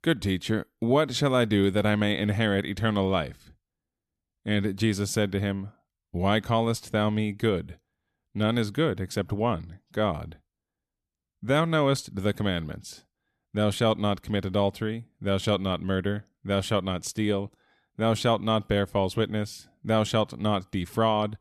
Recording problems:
none

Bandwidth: 13.5 kHz